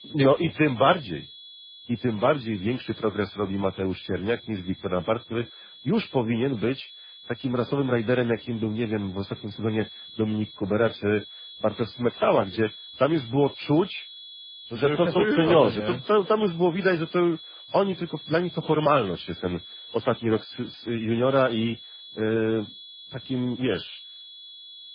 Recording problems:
garbled, watery; badly; nothing above 4.5 kHz
high-pitched whine; noticeable; throughout; 3.5 kHz, 15 dB below the speech

